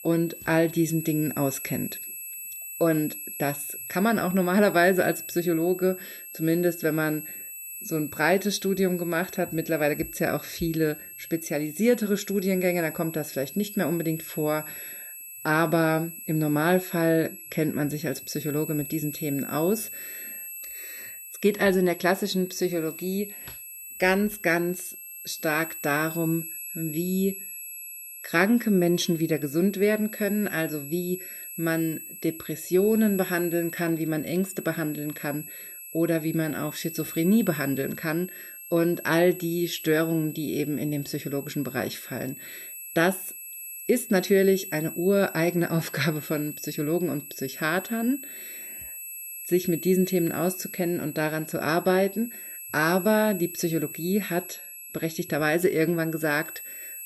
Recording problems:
high-pitched whine; noticeable; throughout; 11.5 kHz, 10 dB below the speech

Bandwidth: 14.5 kHz